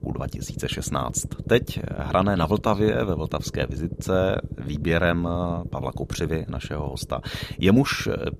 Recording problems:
low rumble; noticeable; throughout; 15 dB below the speech

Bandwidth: 14.5 kHz